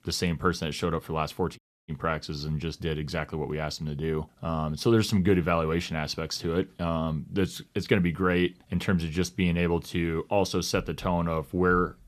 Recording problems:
audio cutting out; at 1.5 s

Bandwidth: 14 kHz